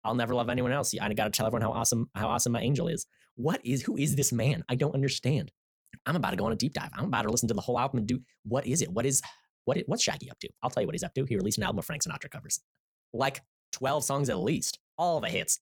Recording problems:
wrong speed, natural pitch; too fast; 1.5 times normal speed

